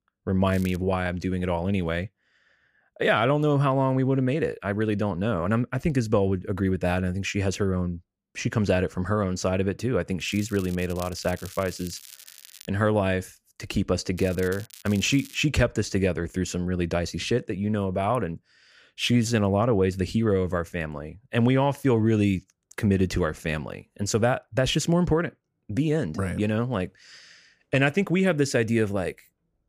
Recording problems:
crackling; noticeable; at 0.5 s, from 10 to 13 s and from 14 to 15 s; 20 dB below the speech

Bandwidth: 15 kHz